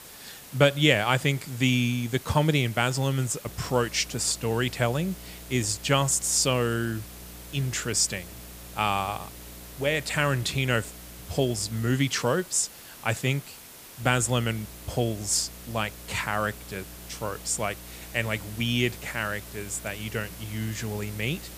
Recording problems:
hiss; noticeable; throughout; 15 dB below the speech
electrical hum; faint; from 3.5 to 12 s and from 14 s on; 60 Hz, 30 dB below the speech

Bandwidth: 15 kHz